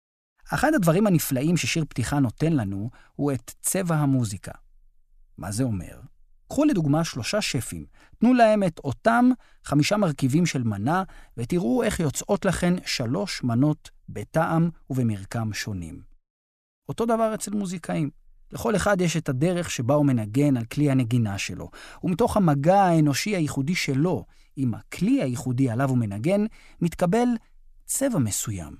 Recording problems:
none

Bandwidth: 14.5 kHz